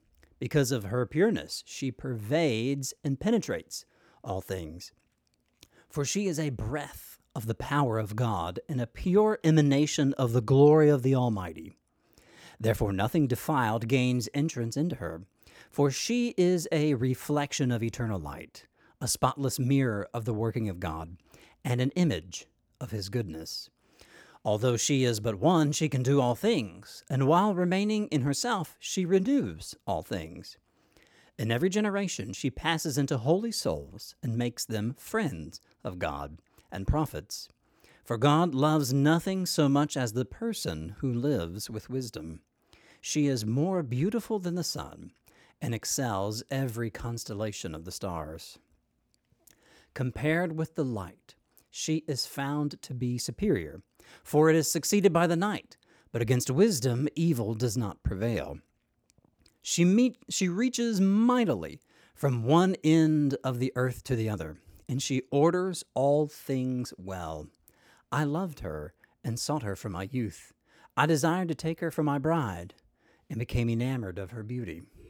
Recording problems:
none

